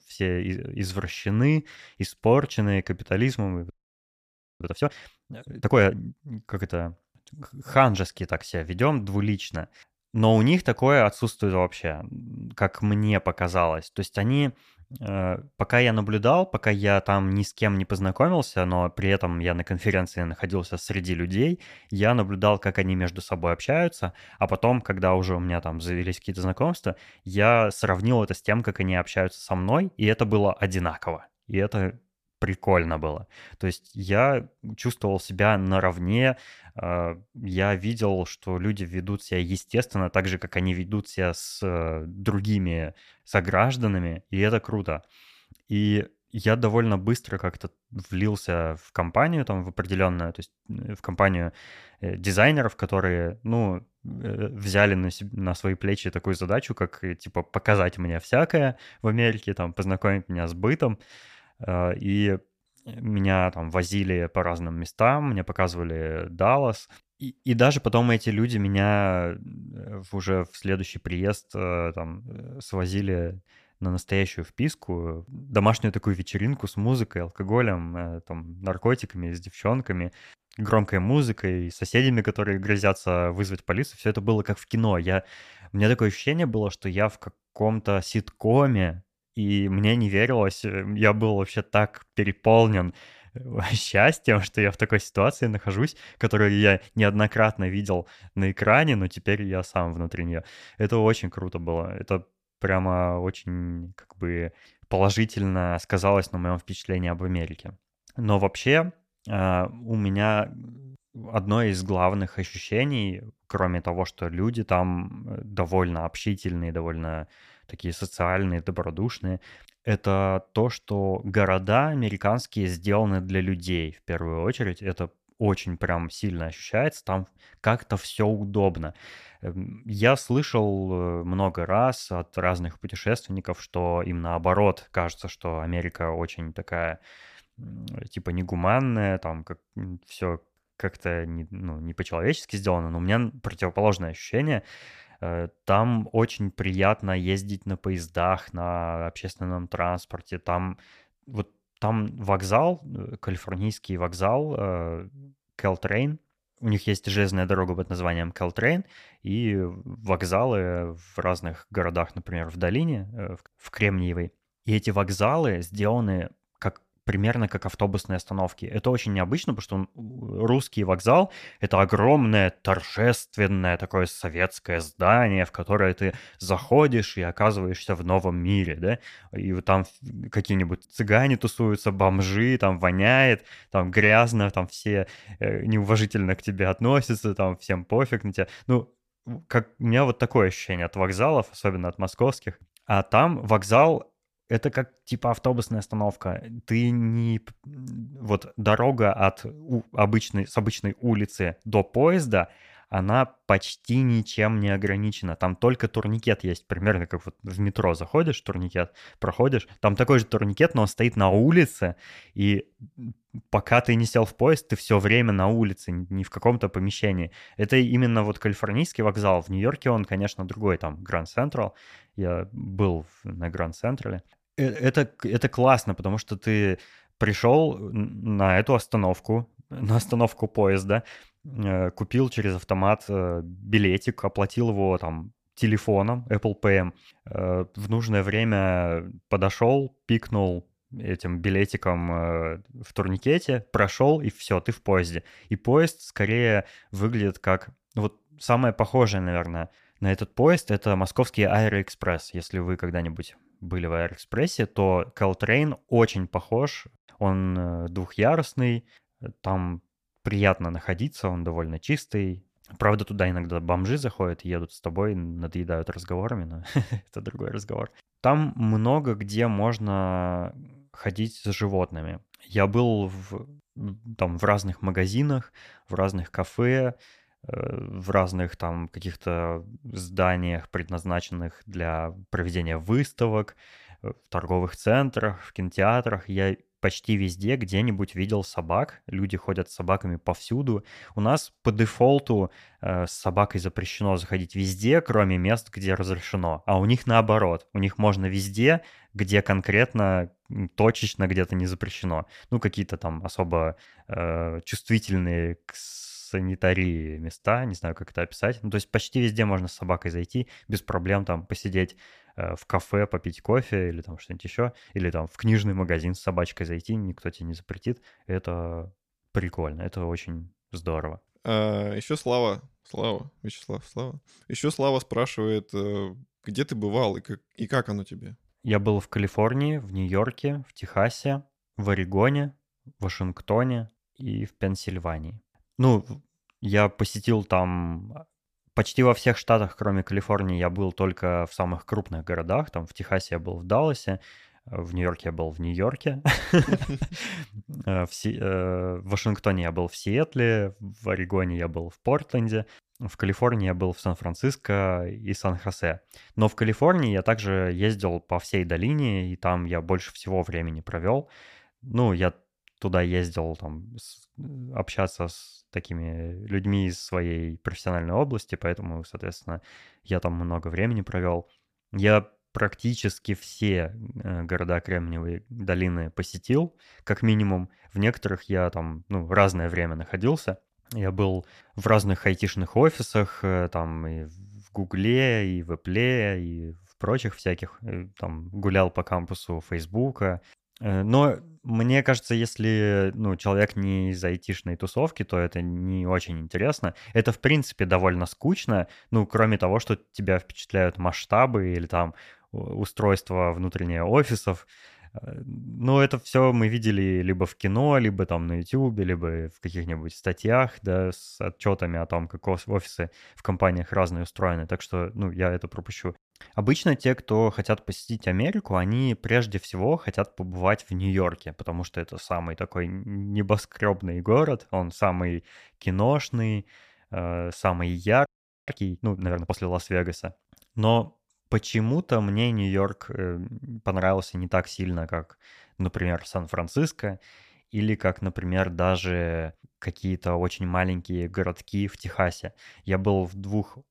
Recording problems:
audio freezing; at 3.5 s for 1 s and at 7:08

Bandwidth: 14.5 kHz